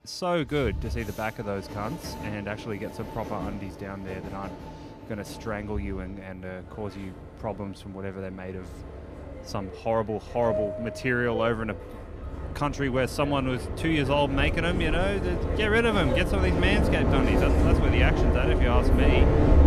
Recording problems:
train or aircraft noise; very loud; throughout; 1 dB above the speech

